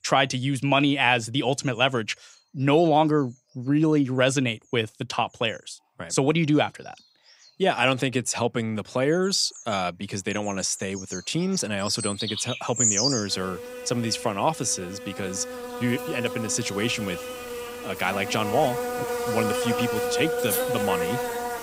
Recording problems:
animal sounds; loud; throughout; 4 dB below the speech

